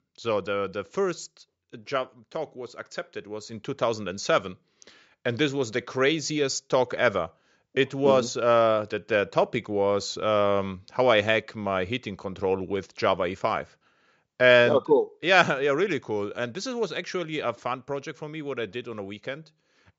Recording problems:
high frequencies cut off; noticeable; nothing above 8 kHz

